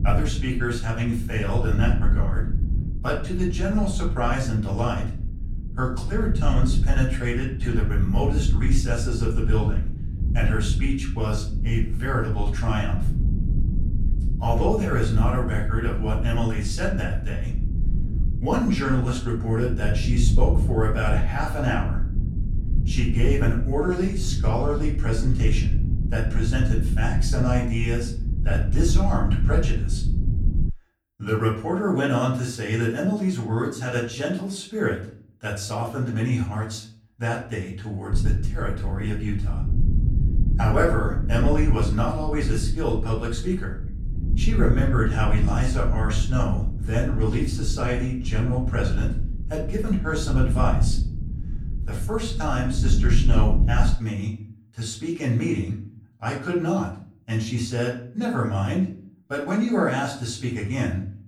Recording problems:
off-mic speech; far
room echo; slight; dies away in 0.4 s
low rumble; noticeable; until 31 s and from 38 to 54 s; 10 dB below the speech

